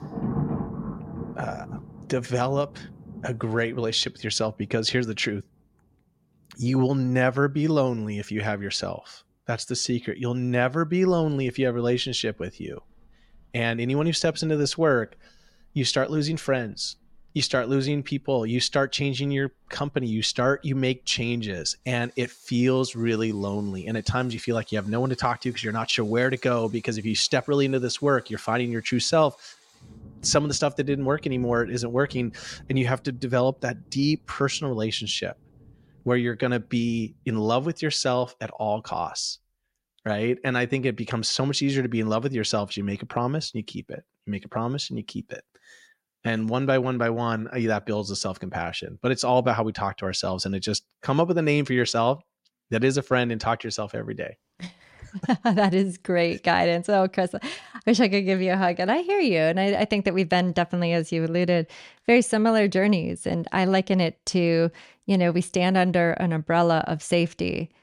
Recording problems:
rain or running water; noticeable; until 37 s; 15 dB below the speech

